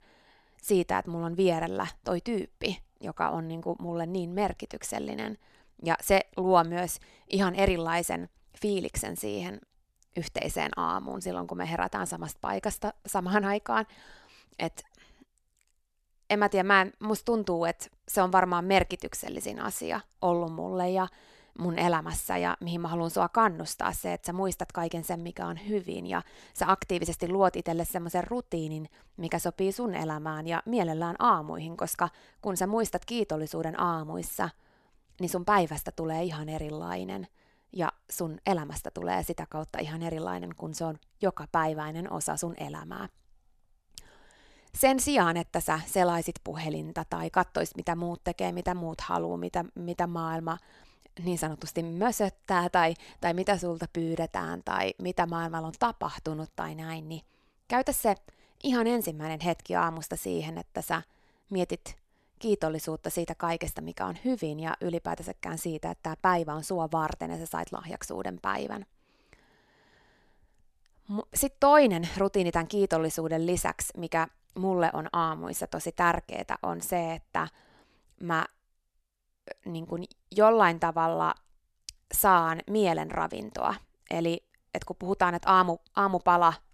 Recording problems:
none

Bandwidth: 13.5 kHz